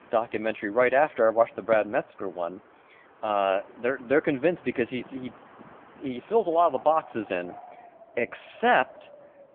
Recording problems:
phone-call audio; poor line
wind in the background; faint; throughout; 20 dB below the speech

